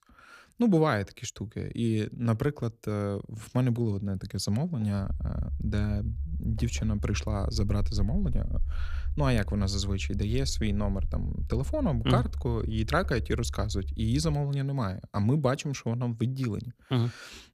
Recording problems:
low rumble; faint; from 5 to 14 s; 20 dB below the speech

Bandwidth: 14.5 kHz